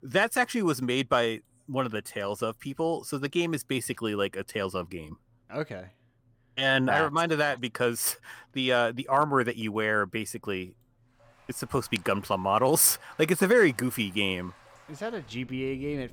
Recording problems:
rain or running water; faint; from 11 s on; 25 dB below the speech

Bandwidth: 17.5 kHz